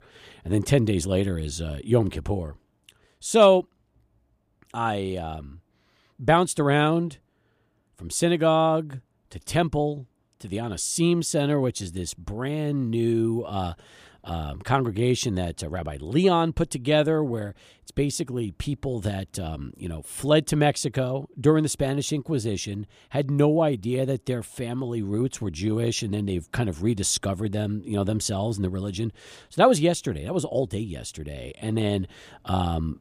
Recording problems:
none

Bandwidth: 15 kHz